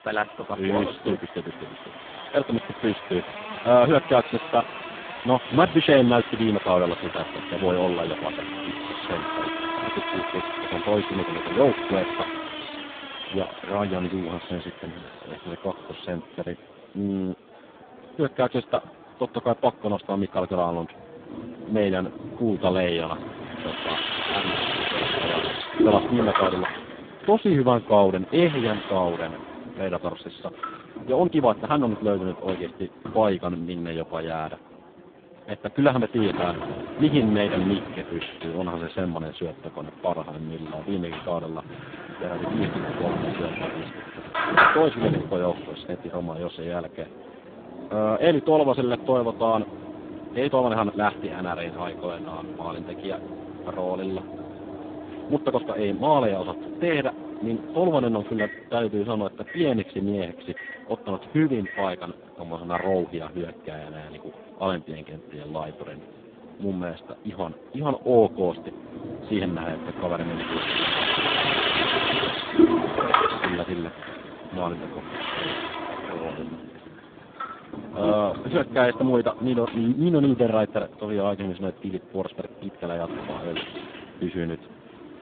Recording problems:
phone-call audio; poor line; nothing above 3.5 kHz
household noises; loud; throughout; 4 dB below the speech
traffic noise; faint; throughout; 25 dB below the speech
murmuring crowd; faint; throughout; 20 dB below the speech
uneven, jittery; strongly; from 31 to 56 s

